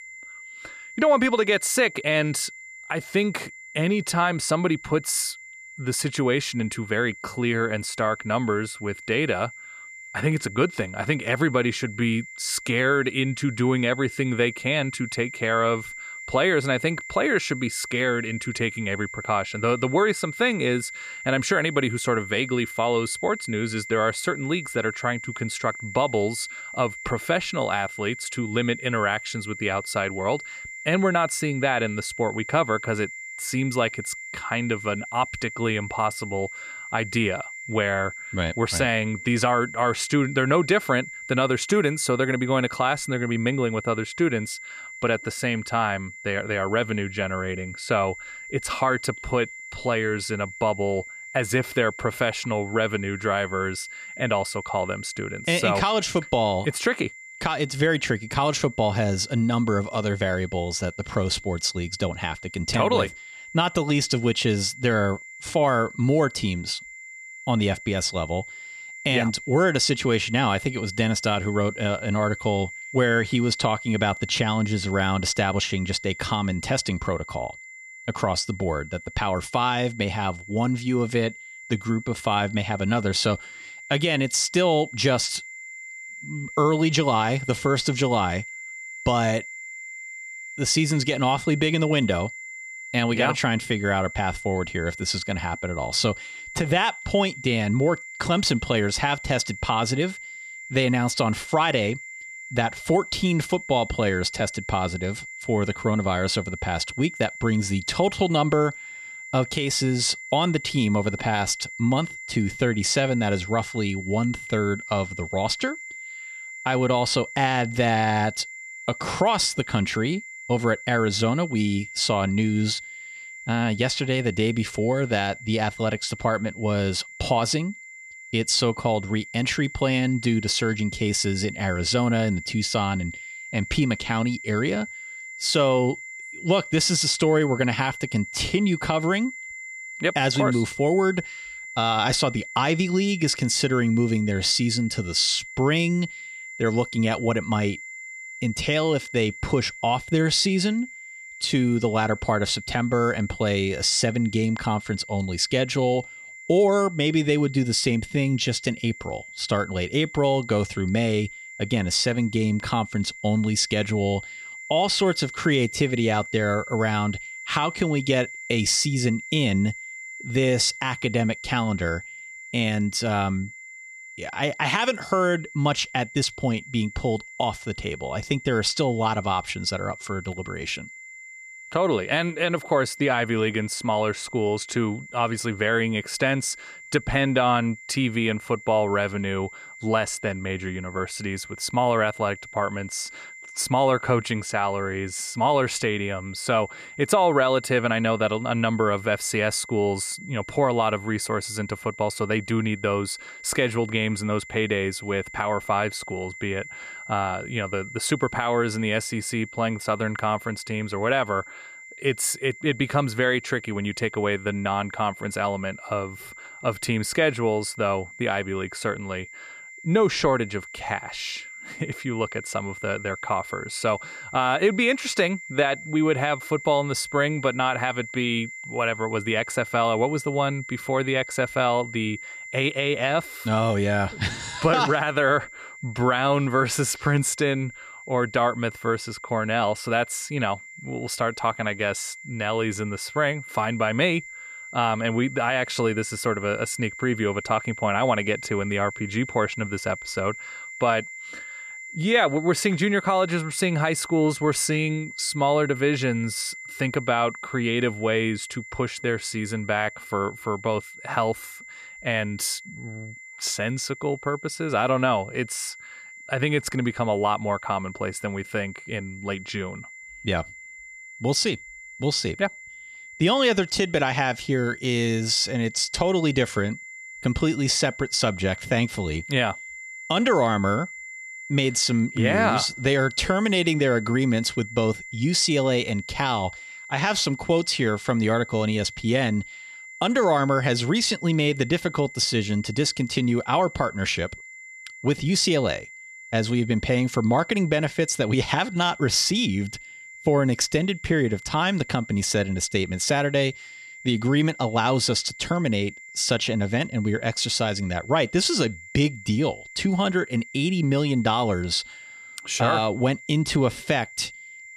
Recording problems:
high-pitched whine; noticeable; throughout; 2 kHz, 15 dB below the speech

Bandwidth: 14.5 kHz